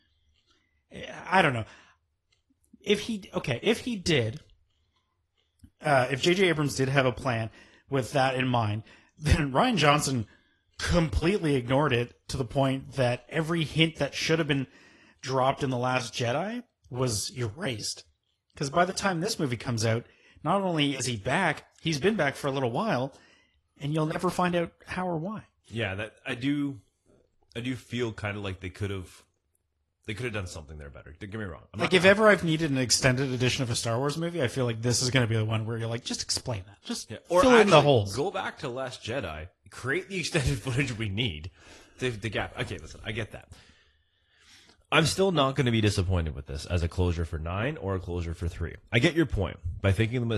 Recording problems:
garbled, watery; slightly; nothing above 11.5 kHz
abrupt cut into speech; at the end

